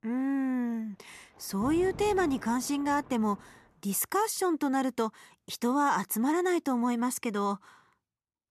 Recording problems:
rain or running water; noticeable; throughout; 15 dB below the speech

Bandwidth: 13.5 kHz